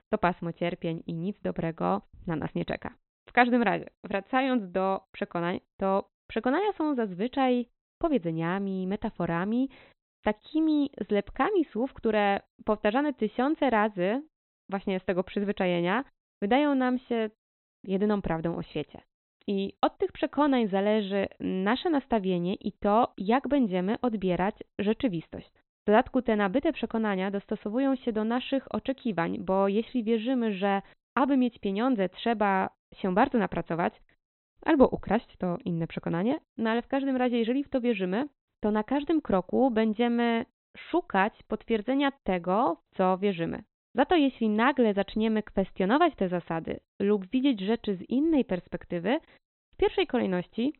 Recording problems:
high frequencies cut off; severe; nothing above 4 kHz

